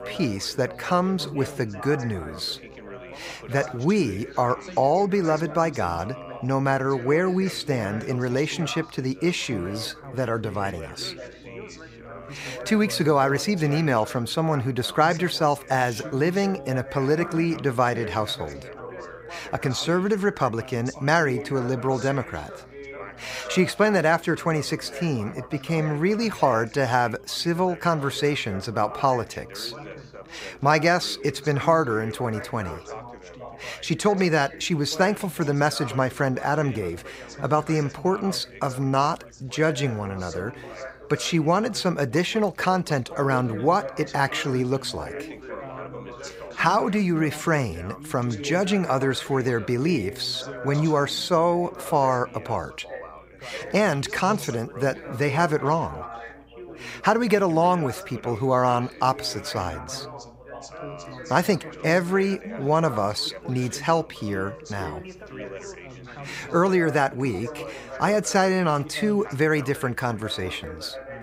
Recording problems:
background chatter; noticeable; throughout; 4 voices, 15 dB below the speech

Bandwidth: 15.5 kHz